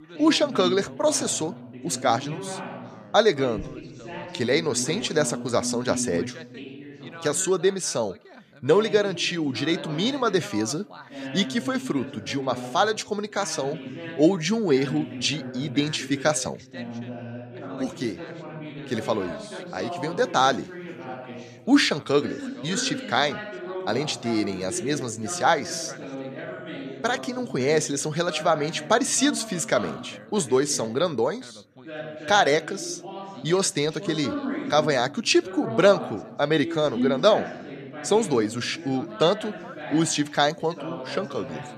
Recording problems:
background chatter; noticeable; throughout; 2 voices, 10 dB below the speech

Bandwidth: 14.5 kHz